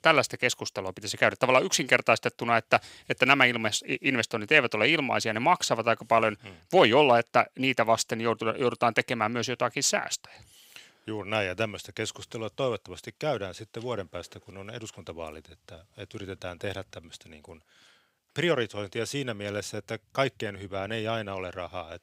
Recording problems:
thin; somewhat; fading below 1 kHz

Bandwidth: 15.5 kHz